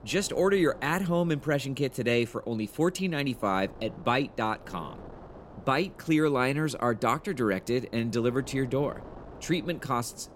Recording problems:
wind noise on the microphone; occasional gusts; 20 dB below the speech

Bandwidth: 16 kHz